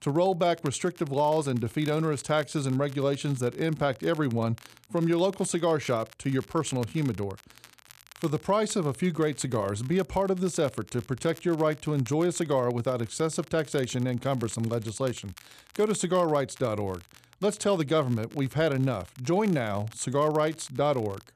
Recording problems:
crackle, like an old record; faint; 25 dB below the speech

